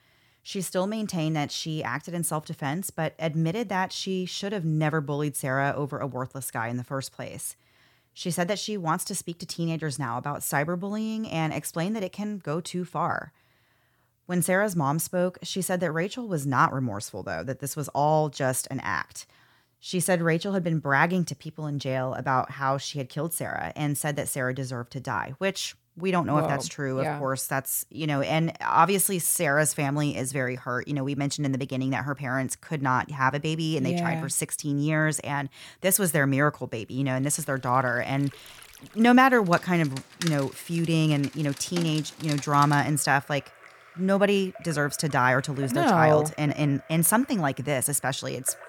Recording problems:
rain or running water; noticeable; from 37 s on; 15 dB below the speech

